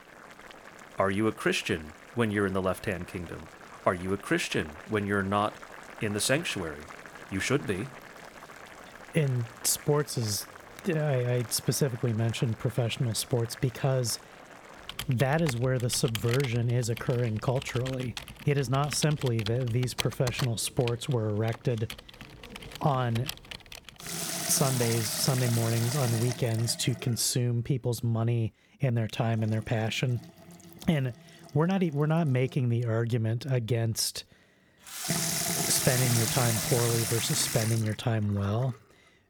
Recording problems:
household noises; loud; throughout; 6 dB below the speech

